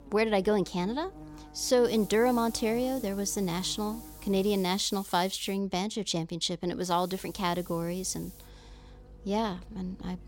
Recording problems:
hiss; noticeable; from 2 to 5.5 s and from 7 to 8.5 s; 20 dB below the speech
electrical hum; faint; until 4.5 s and from 7 s on; 50 Hz, 20 dB below the speech

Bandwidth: 16.5 kHz